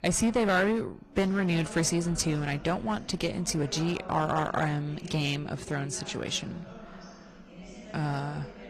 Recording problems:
distortion; slight; 6% of the sound clipped
garbled, watery; slightly; nothing above 14 kHz
chatter from many people; noticeable; throughout; 15 dB below the speech

